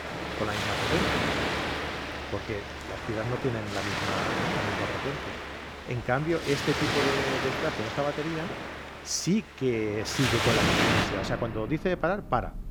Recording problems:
rain or running water; very loud; throughout; 2 dB above the speech

